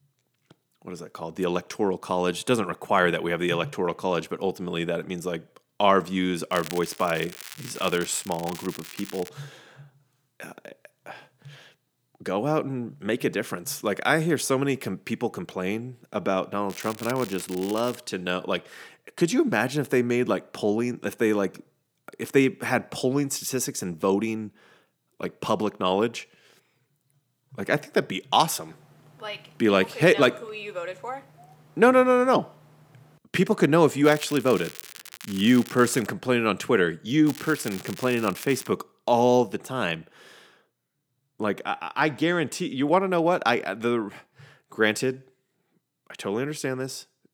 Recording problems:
crackling; noticeable; 4 times, first at 6.5 s; 15 dB below the speech

